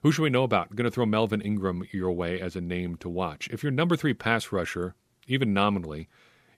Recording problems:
none

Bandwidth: 15 kHz